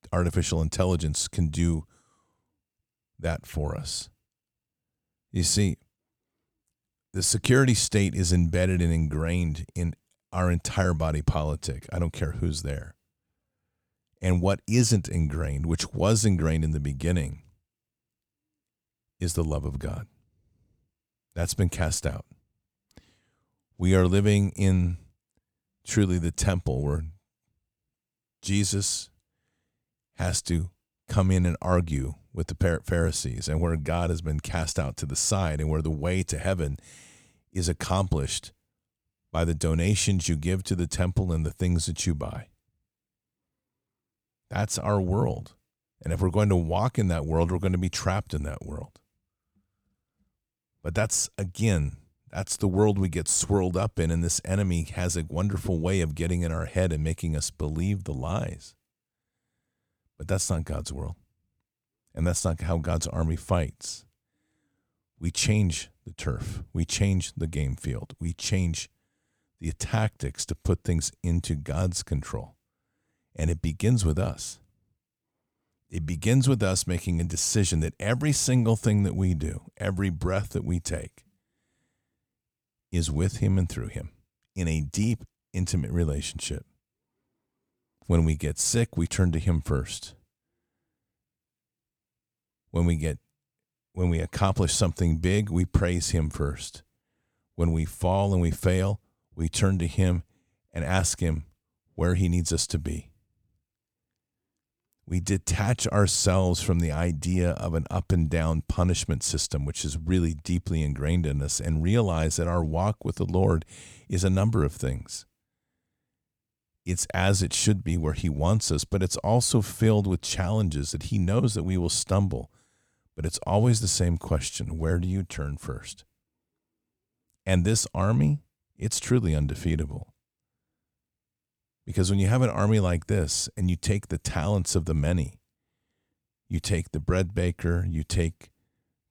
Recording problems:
none

